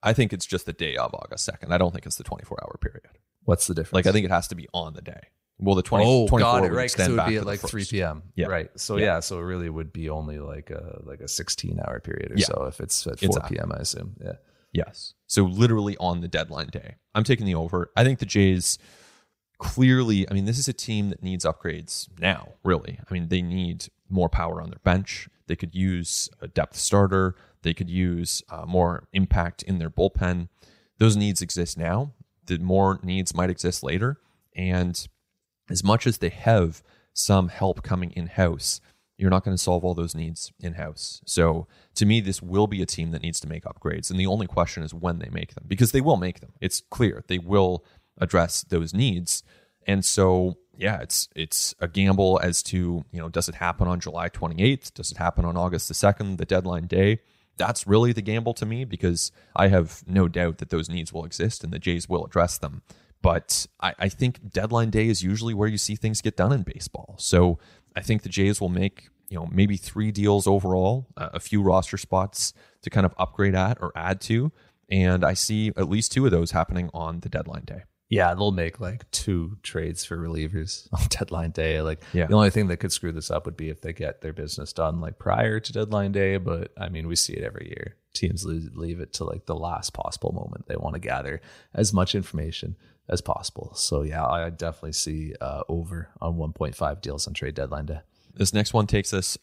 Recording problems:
none

